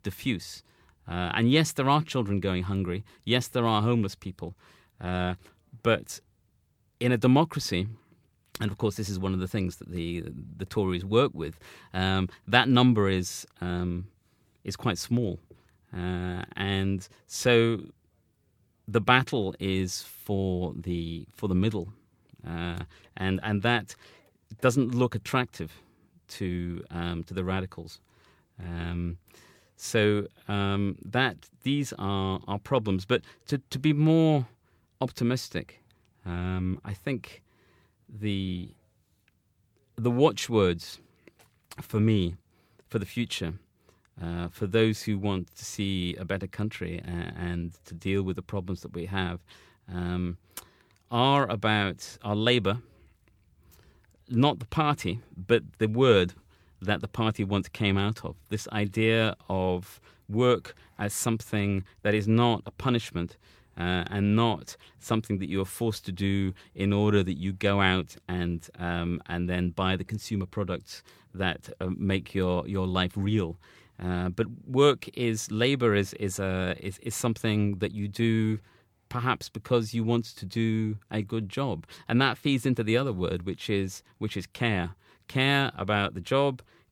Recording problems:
none

